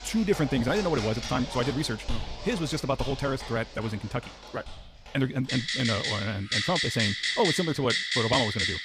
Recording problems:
wrong speed, natural pitch; too fast; 1.5 times normal speed
household noises; loud; throughout; 1 dB below the speech

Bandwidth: 15 kHz